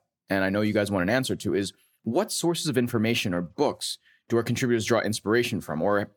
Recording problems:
none

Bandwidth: 18 kHz